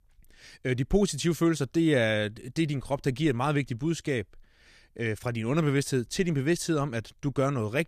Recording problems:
none

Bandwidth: 14.5 kHz